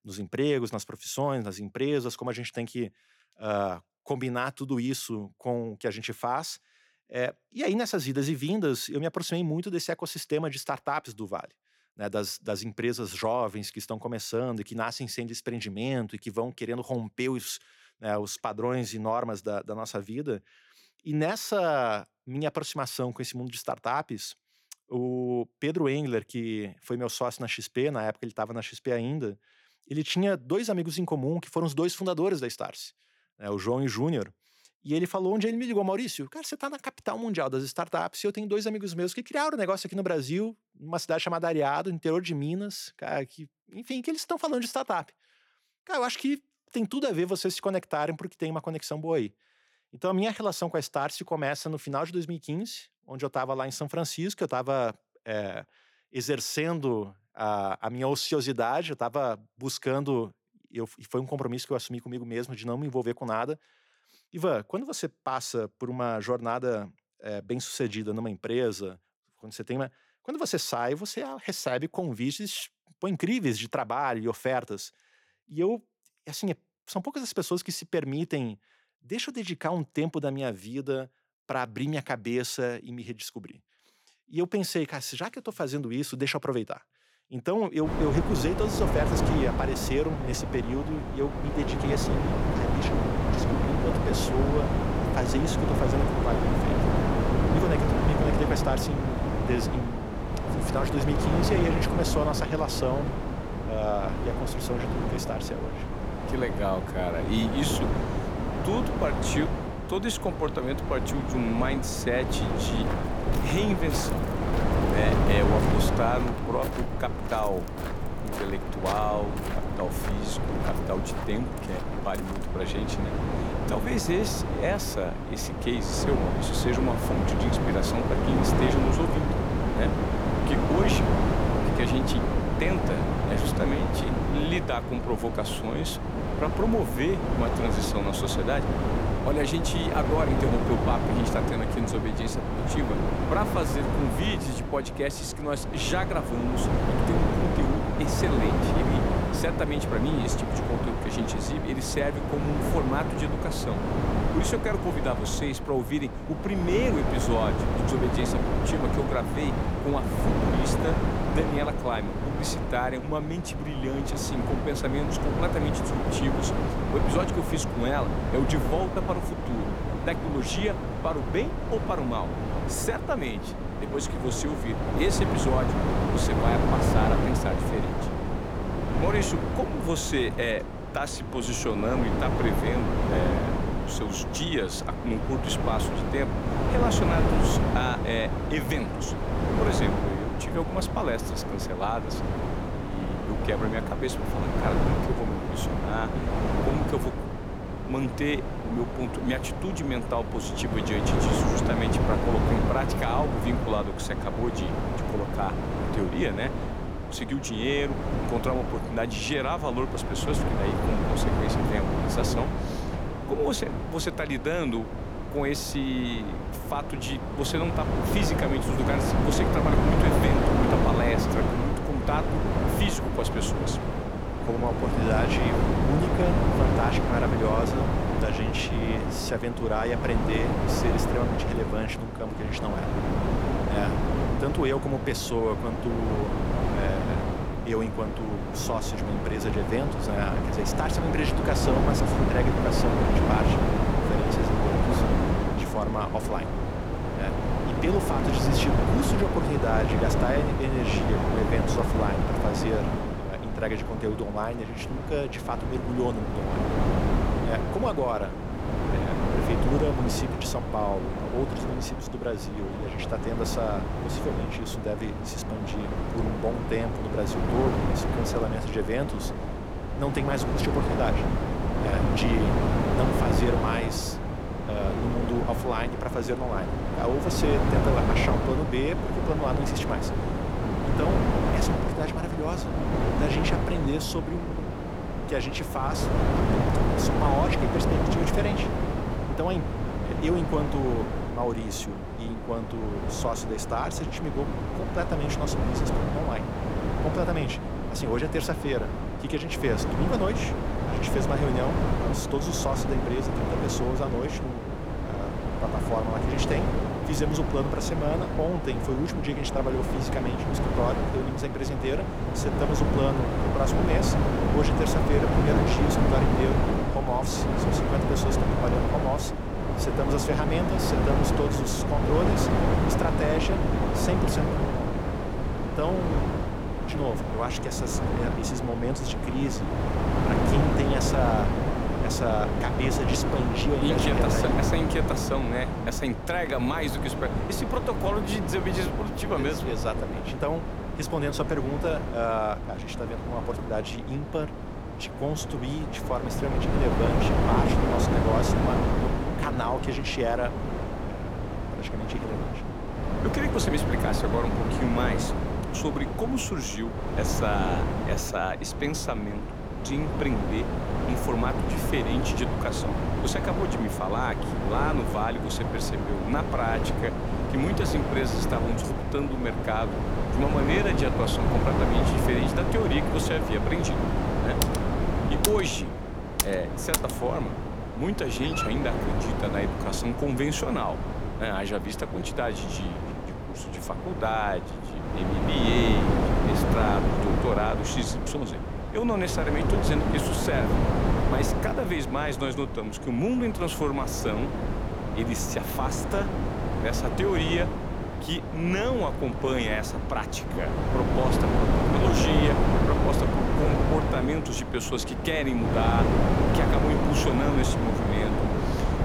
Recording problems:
wind noise on the microphone; heavy; from 1:28 on; as loud as the speech
footsteps; noticeable; from 1:53 to 2:03; peak 5 dB below the speech
keyboard typing; loud; from 6:15 to 6:17; peak 3 dB above the speech
dog barking; noticeable; at 6:18; peak 2 dB below the speech

